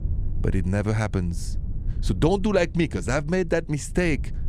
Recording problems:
low rumble; faint; throughout; 25 dB below the speech

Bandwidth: 14.5 kHz